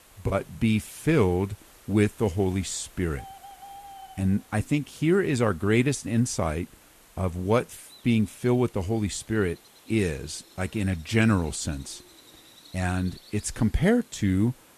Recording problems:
animal sounds; faint; throughout; 25 dB below the speech
hiss; faint; throughout; 25 dB below the speech

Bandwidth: 13.5 kHz